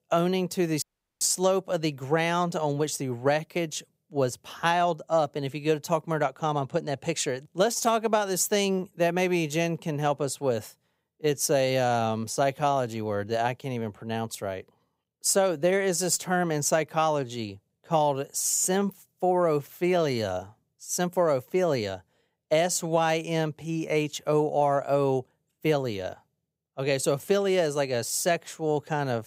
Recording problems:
audio cutting out; at 1 s

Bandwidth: 15.5 kHz